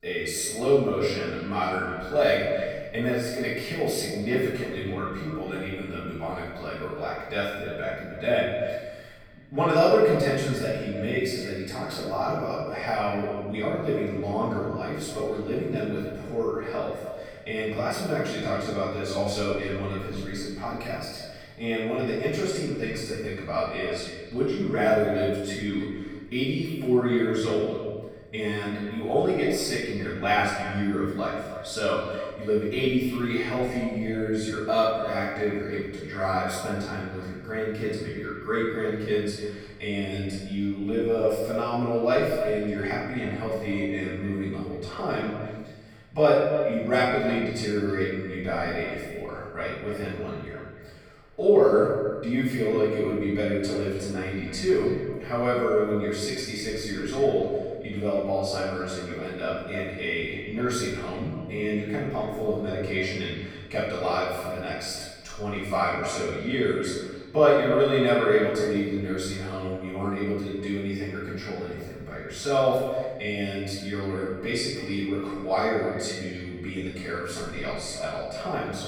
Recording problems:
echo of what is said; strong; throughout; 300 ms later, 10 dB below the speech
off-mic speech; far
room echo; noticeable; dies away in 1.2 s

